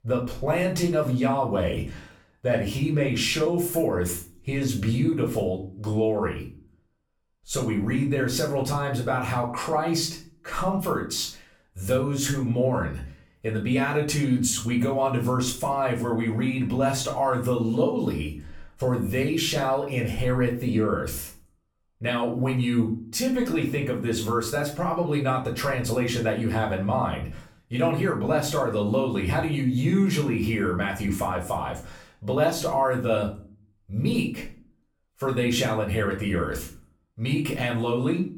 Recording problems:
off-mic speech; far
room echo; slight; dies away in 0.4 s

